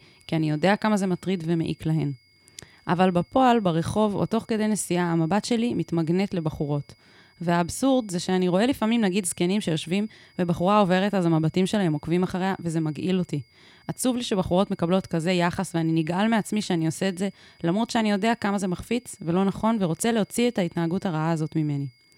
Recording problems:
high-pitched whine; faint; throughout; 2 kHz, 35 dB below the speech

